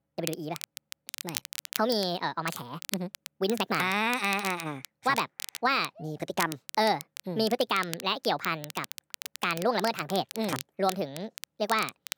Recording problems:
wrong speed and pitch; too fast and too high; 1.5 times normal speed
crackle, like an old record; noticeable; 10 dB below the speech

